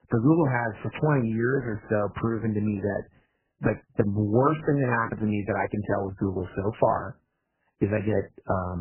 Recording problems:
garbled, watery; badly; nothing above 2.5 kHz
abrupt cut into speech; at the end

